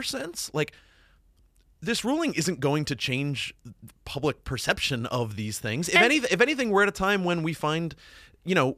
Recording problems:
abrupt cut into speech; at the start

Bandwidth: 14.5 kHz